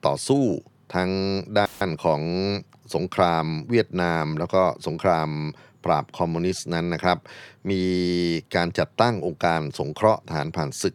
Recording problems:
audio cutting out; filled with static; at 1.5 s

